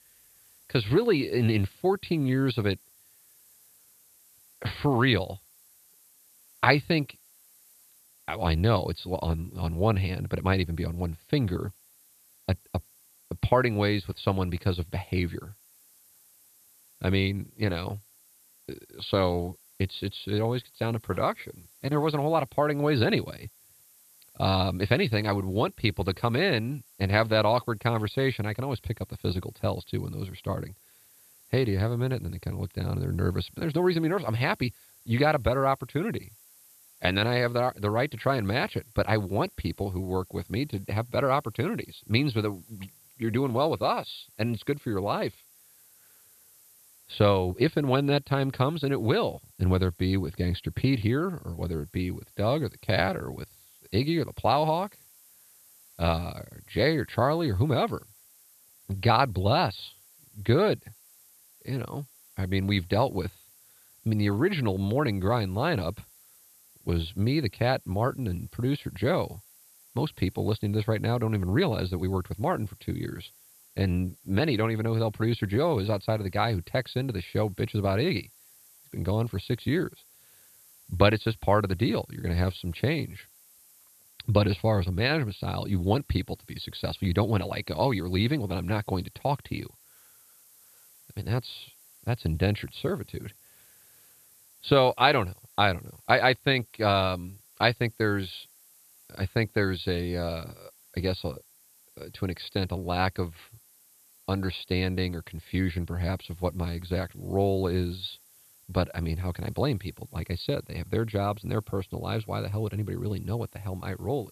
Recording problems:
high frequencies cut off; severe; nothing above 5 kHz
hiss; faint; throughout; 25 dB below the speech

